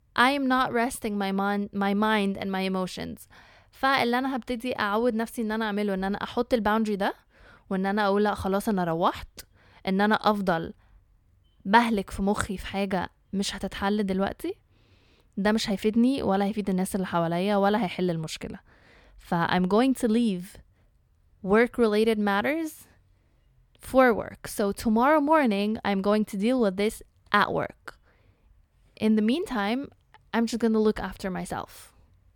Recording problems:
none

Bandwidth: 18.5 kHz